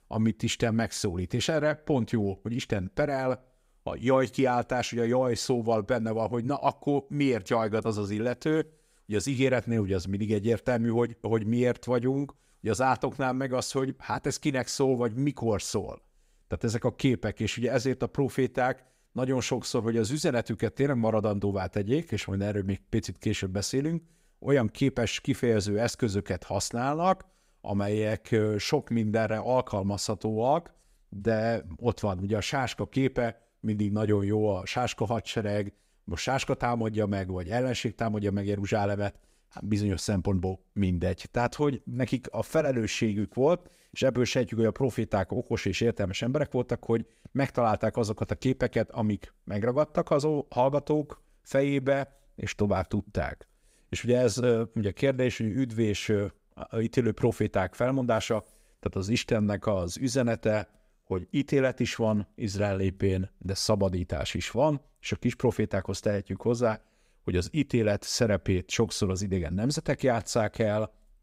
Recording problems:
none

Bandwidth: 15.5 kHz